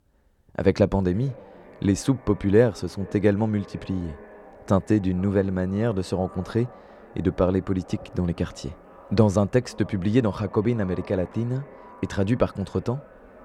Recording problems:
echo of what is said; faint; throughout; 460 ms later, 20 dB below the speech

